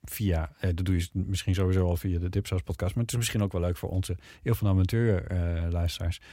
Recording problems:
none

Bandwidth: 16 kHz